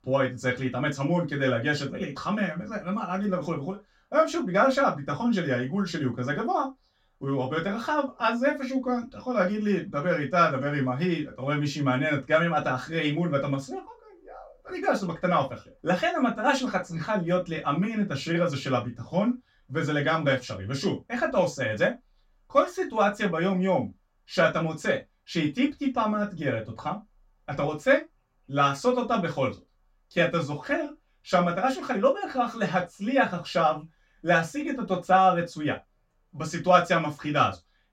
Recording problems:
off-mic speech; far
room echo; very slight; dies away in 0.2 s

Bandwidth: 16 kHz